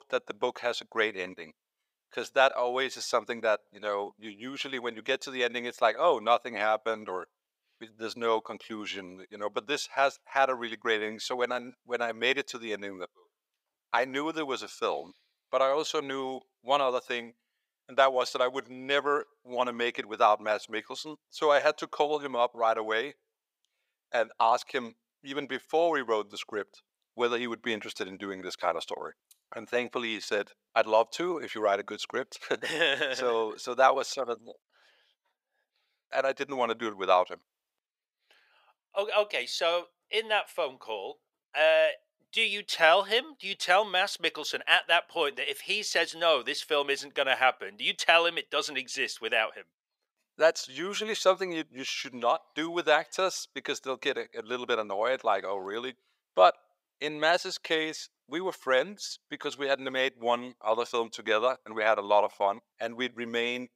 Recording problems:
thin; very; fading below 650 Hz

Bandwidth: 15.5 kHz